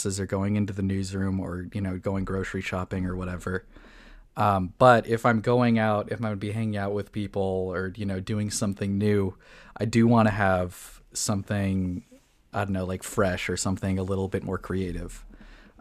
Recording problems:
abrupt cut into speech; at the start

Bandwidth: 14.5 kHz